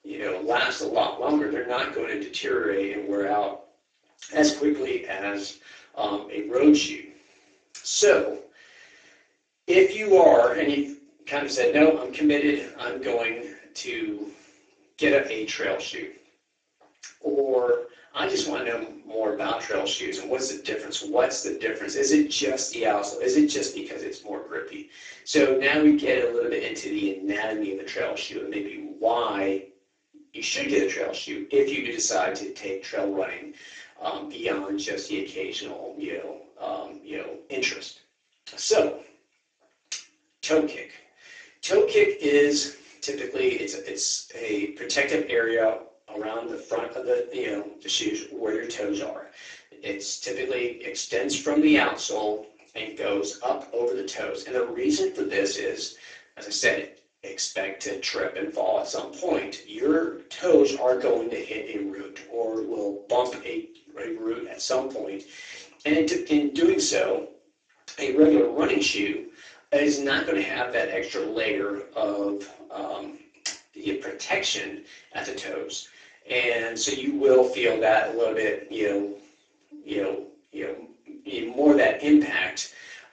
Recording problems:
off-mic speech; far
garbled, watery; badly
thin; somewhat; fading below 300 Hz
room echo; slight; dies away in 0.3 s

